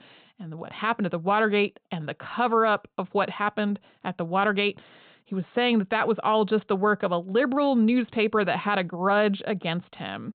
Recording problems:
high frequencies cut off; severe; nothing above 4 kHz

